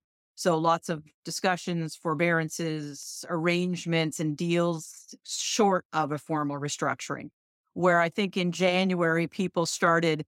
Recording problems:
none

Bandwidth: 16 kHz